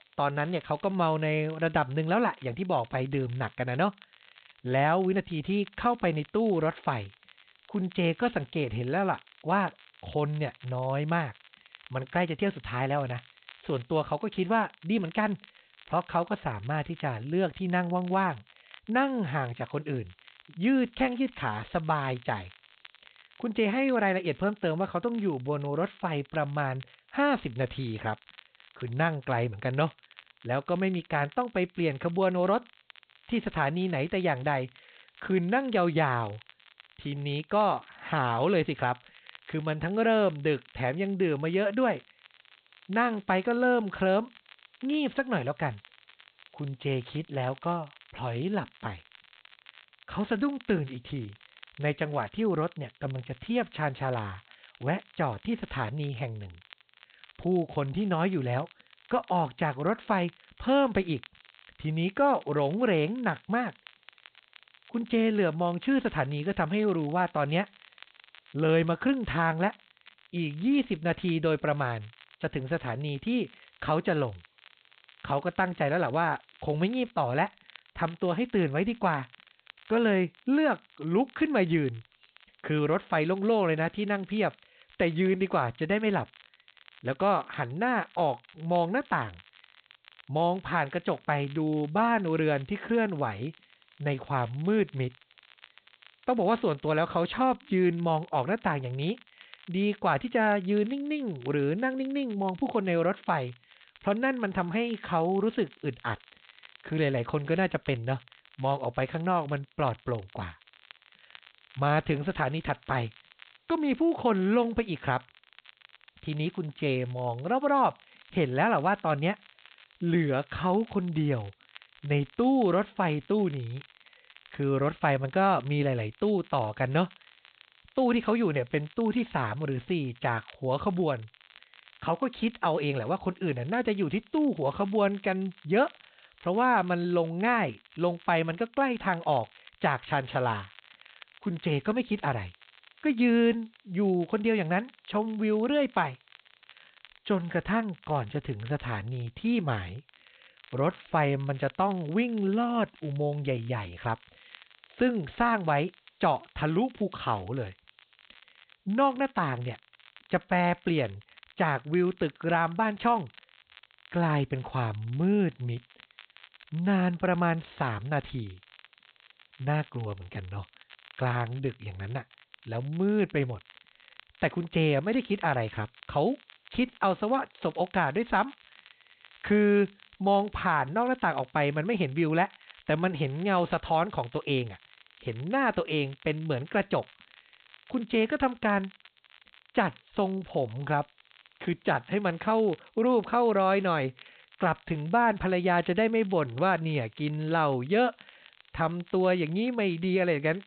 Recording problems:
high frequencies cut off; severe; nothing above 4 kHz
crackle, like an old record; faint; 25 dB below the speech
hiss; very faint; throughout; 40 dB below the speech

